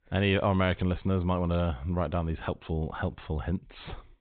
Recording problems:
high frequencies cut off; severe; nothing above 4 kHz

